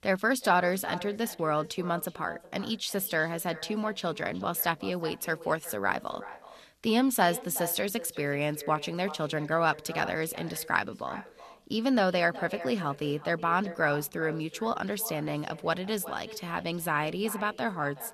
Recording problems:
echo of what is said; noticeable; throughout; 370 ms later, 15 dB below the speech

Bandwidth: 13.5 kHz